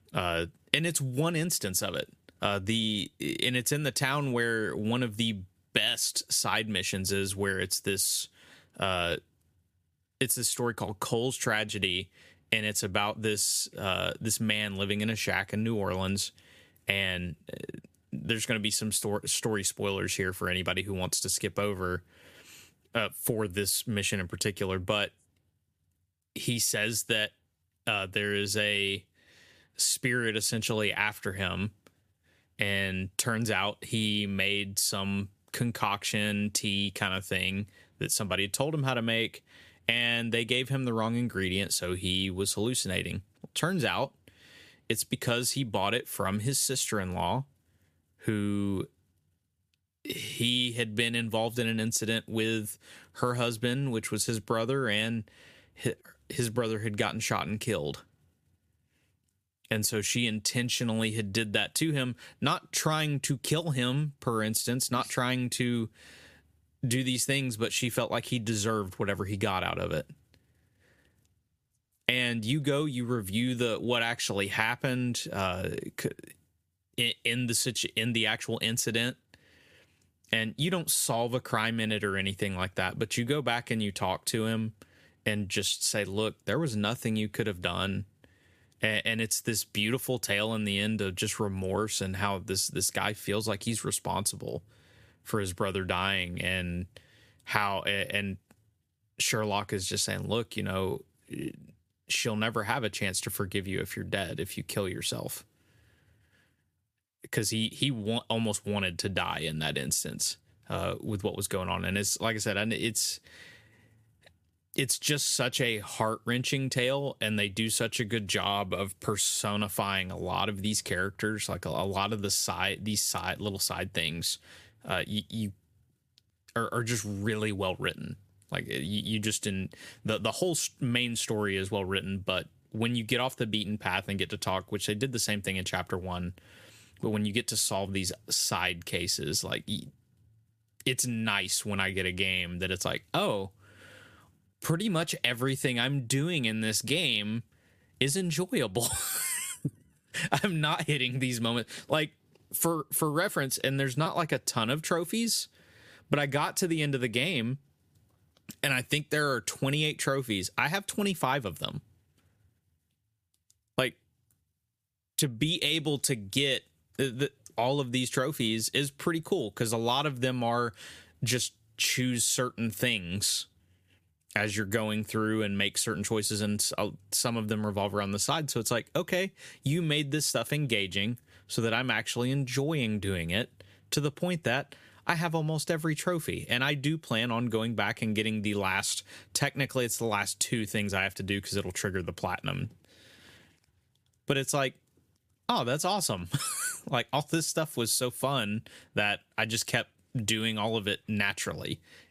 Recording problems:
squashed, flat; somewhat

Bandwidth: 15 kHz